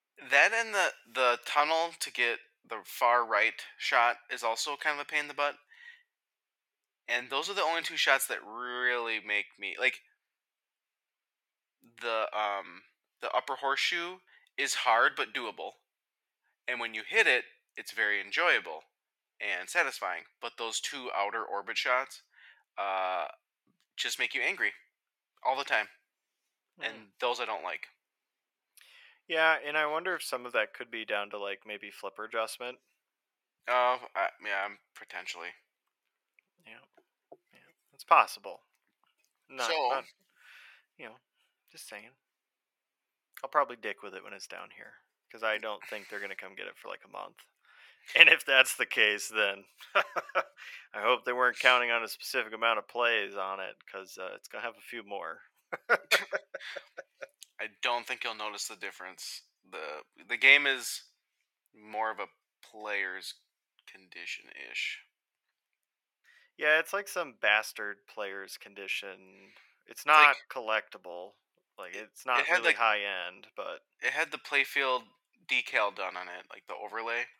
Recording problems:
thin; very; fading below 600 Hz

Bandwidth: 17 kHz